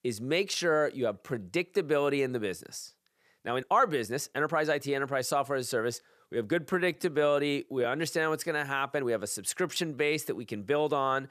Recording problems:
uneven, jittery; strongly; from 1 to 10 s

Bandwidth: 14.5 kHz